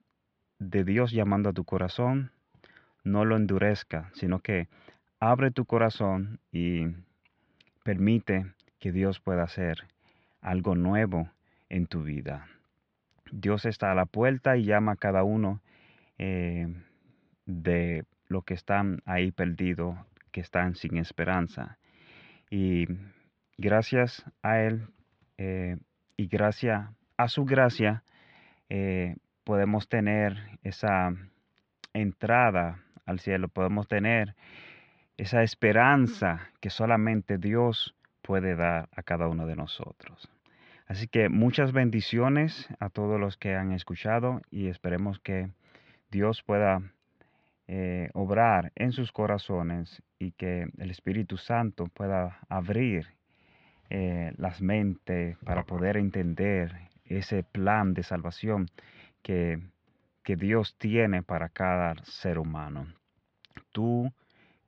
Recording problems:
muffled; slightly; fading above 3.5 kHz

